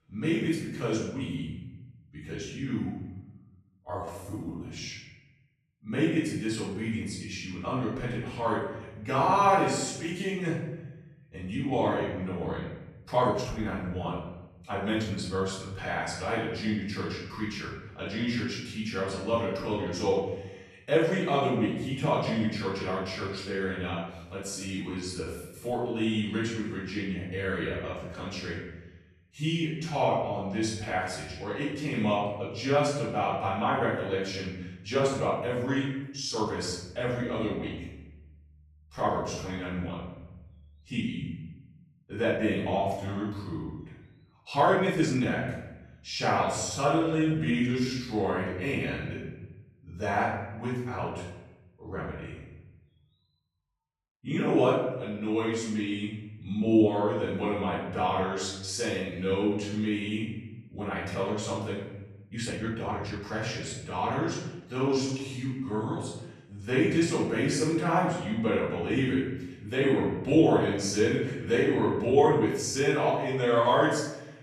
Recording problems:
off-mic speech; far
room echo; noticeable; dies away in 1 s
uneven, jittery; strongly; from 3.5 s to 1:13

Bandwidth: 13.5 kHz